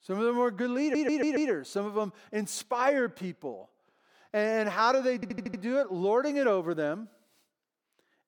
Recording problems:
audio stuttering; at 1 s and at 5 s

